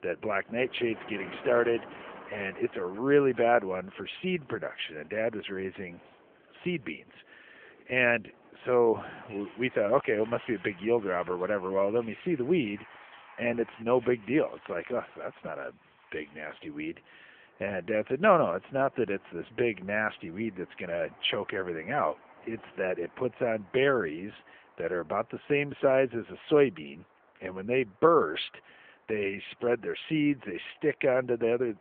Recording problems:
phone-call audio
traffic noise; faint; throughout; 20 dB below the speech

